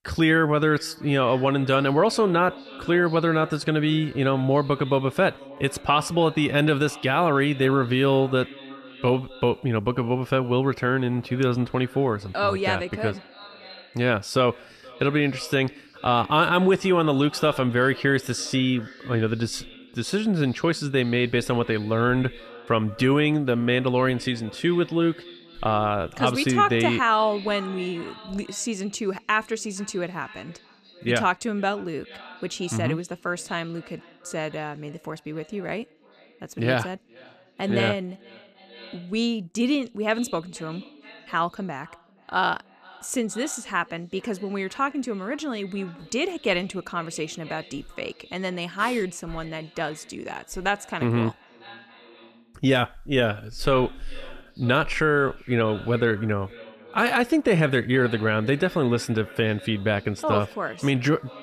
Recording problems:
echo of what is said; faint; throughout; 470 ms later, 20 dB below the speech

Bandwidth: 14.5 kHz